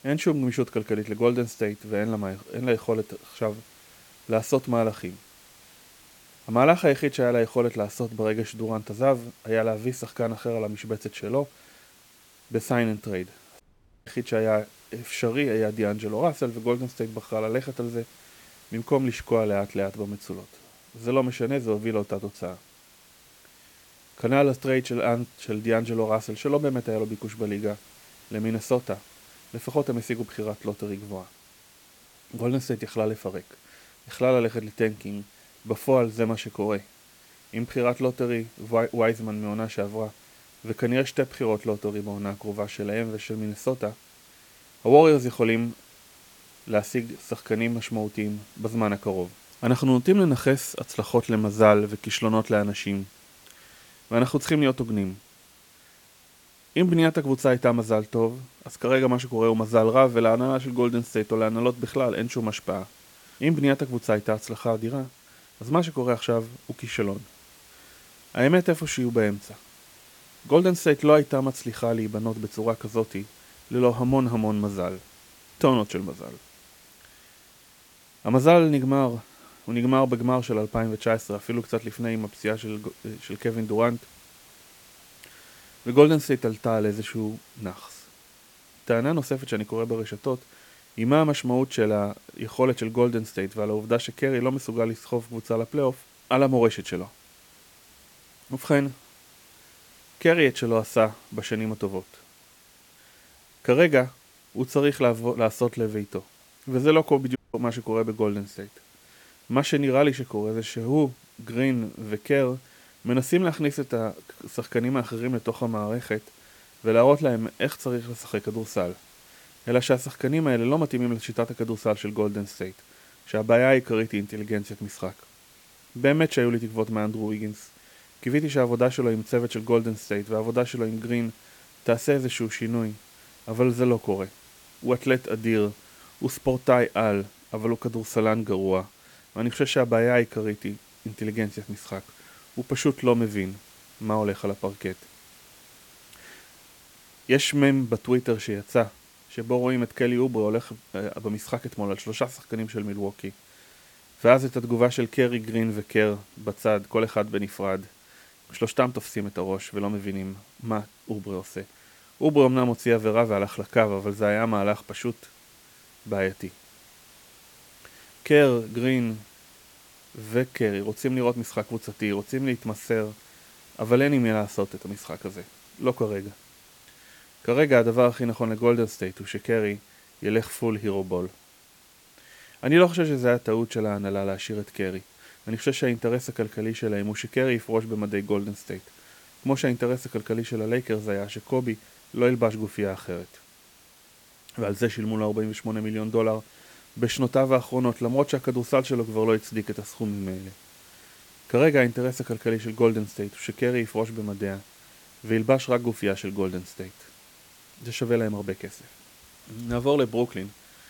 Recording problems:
hiss; faint; throughout; 25 dB below the speech
audio cutting out; at 14 s and at 1:47

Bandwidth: 17.5 kHz